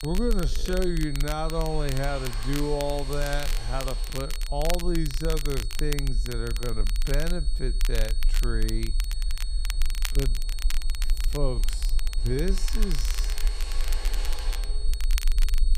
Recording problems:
wrong speed, natural pitch; too slow; 0.5 times normal speed
crackle, like an old record; loud; 8 dB below the speech
high-pitched whine; noticeable; throughout; 4.5 kHz, 10 dB below the speech
machinery noise; noticeable; throughout; 15 dB below the speech
low rumble; faint; throughout; 25 dB below the speech

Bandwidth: 15 kHz